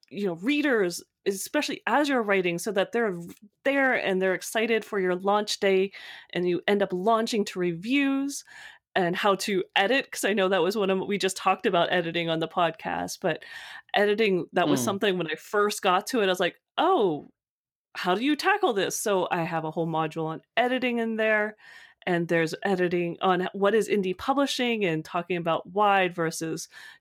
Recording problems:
uneven, jittery; slightly; from 1 to 23 s

